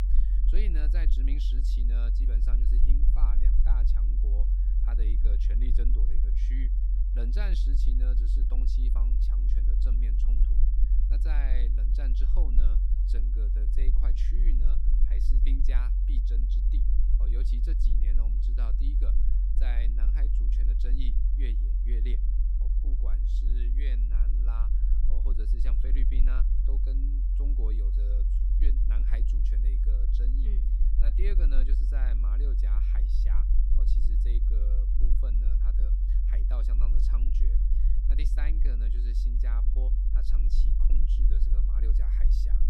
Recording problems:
low rumble; loud; throughout; 2 dB below the speech

